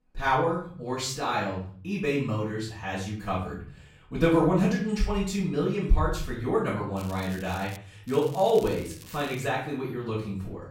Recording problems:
off-mic speech; far
room echo; noticeable; dies away in 0.5 s
crackling; noticeable; at 7 s and from 8 to 9.5 s; 20 dB below the speech

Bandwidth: 16 kHz